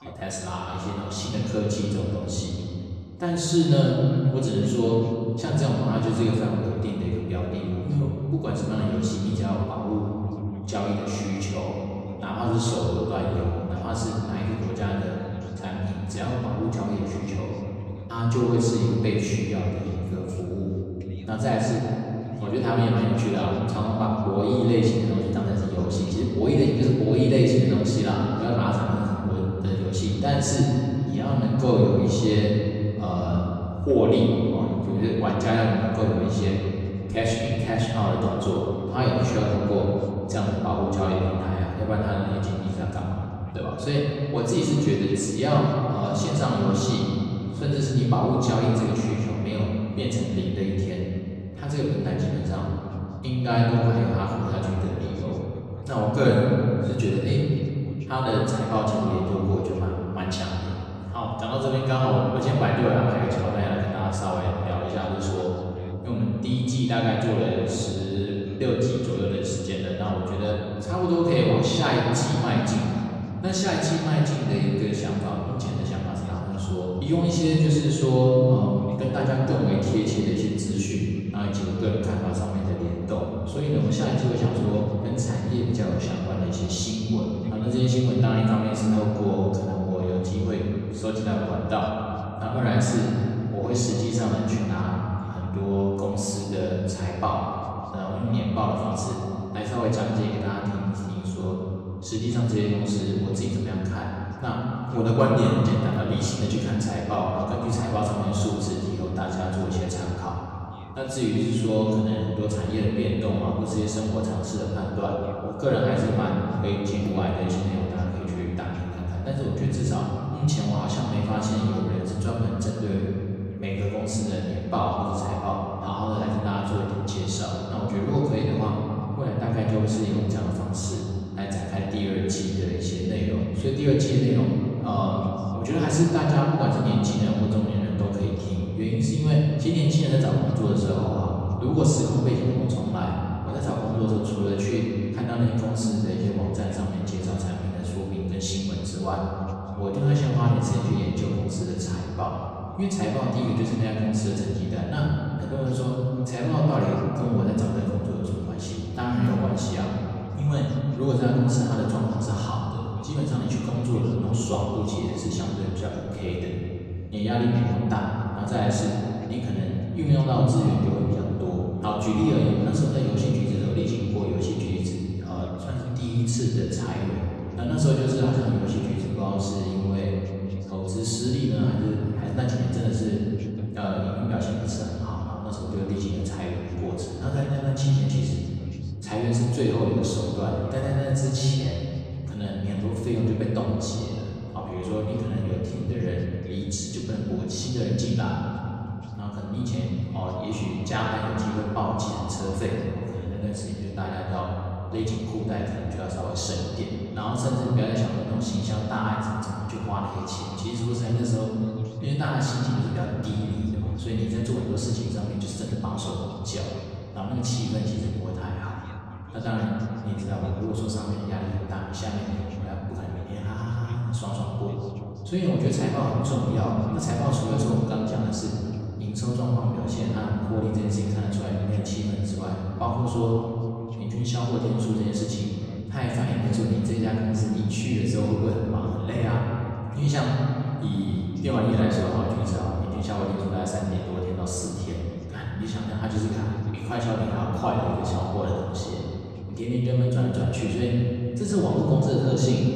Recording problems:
off-mic speech; far
room echo; noticeable; dies away in 2.8 s
voice in the background; faint; throughout; 25 dB below the speech

